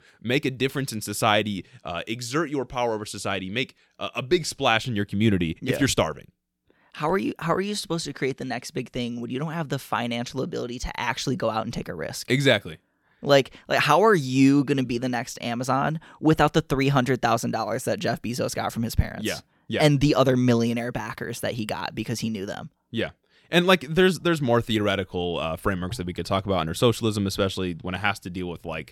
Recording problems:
none

